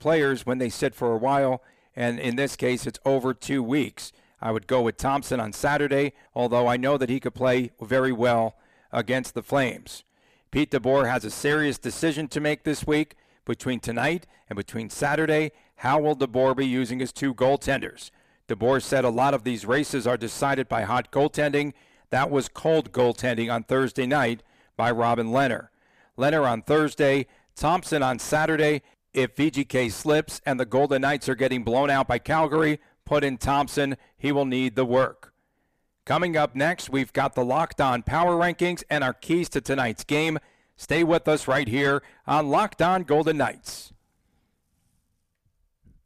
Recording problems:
distortion; slight; 10 dB below the speech

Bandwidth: 15 kHz